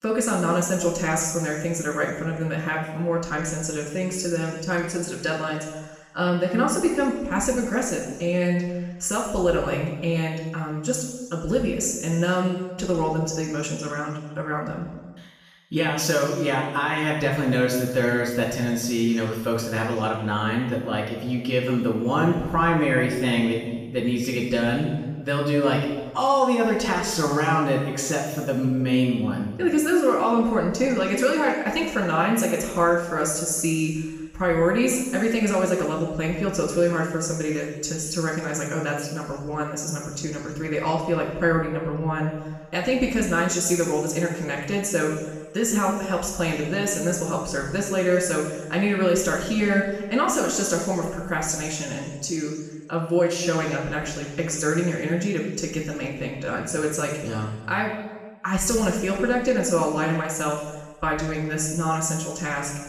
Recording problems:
off-mic speech; far
room echo; noticeable; dies away in 1.2 s

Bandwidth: 15 kHz